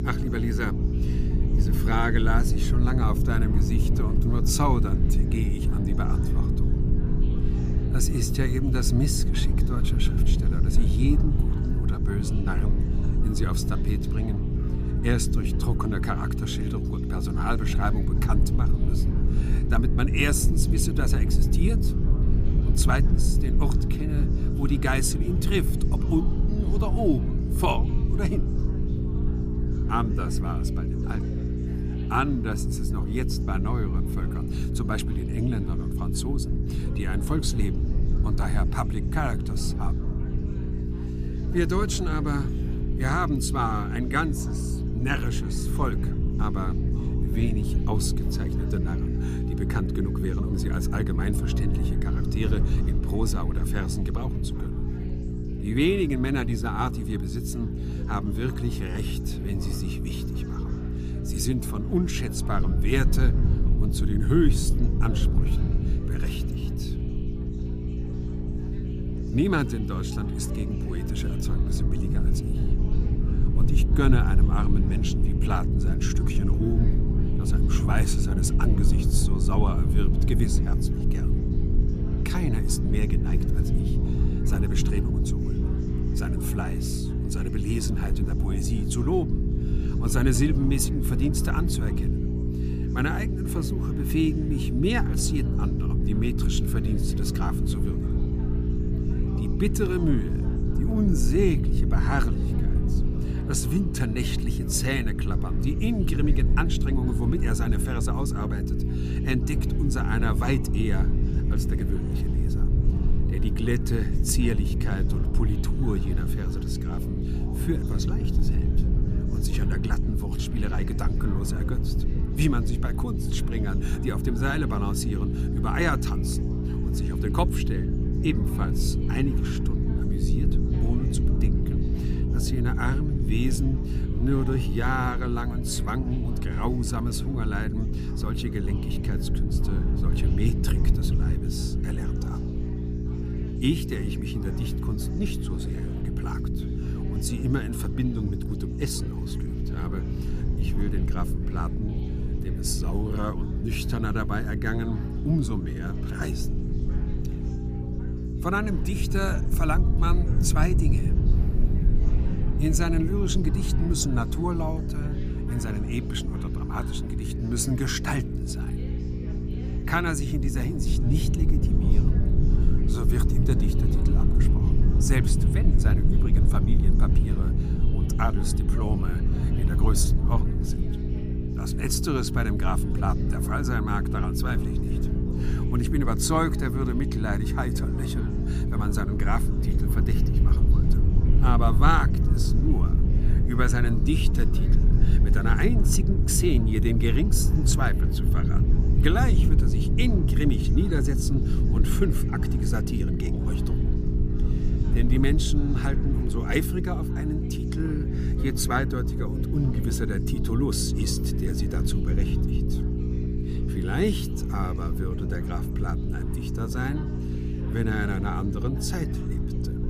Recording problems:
electrical hum; loud; throughout; 60 Hz, 6 dB below the speech
chatter from many people; noticeable; throughout; 20 dB below the speech
low rumble; noticeable; throughout; 10 dB below the speech

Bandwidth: 15 kHz